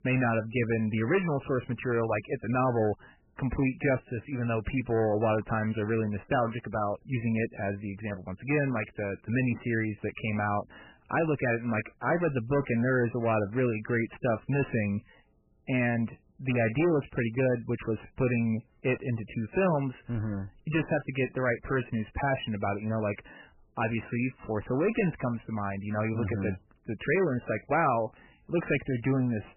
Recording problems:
garbled, watery; badly; nothing above 3 kHz
distortion; slight; 9 dB below the speech

